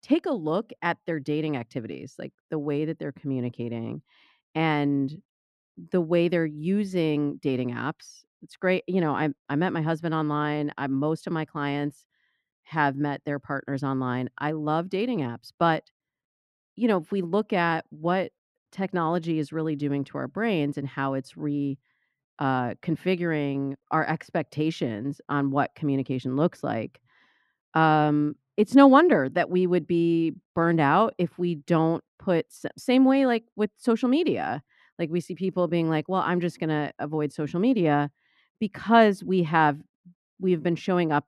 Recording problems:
muffled; slightly; fading above 3 kHz

